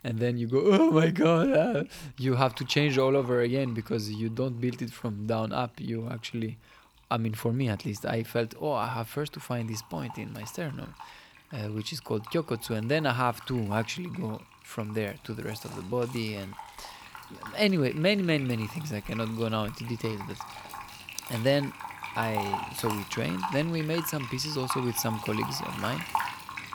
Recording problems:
household noises; noticeable; throughout; 10 dB below the speech

